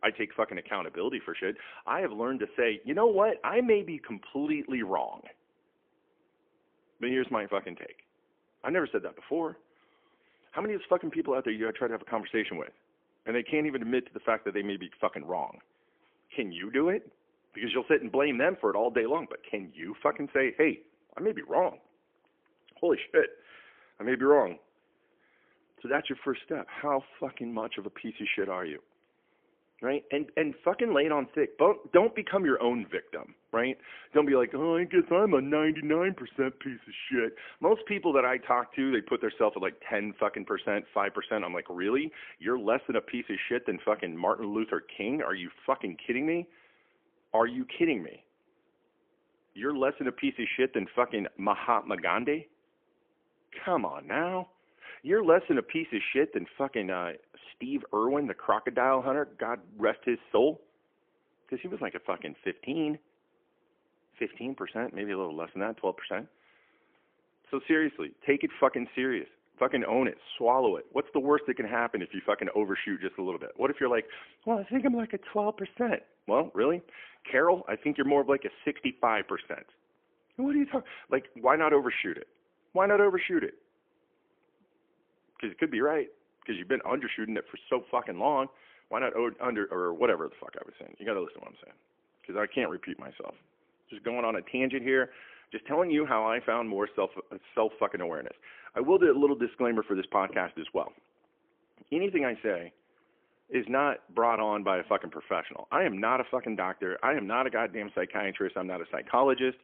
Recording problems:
phone-call audio; poor line; nothing above 3.5 kHz

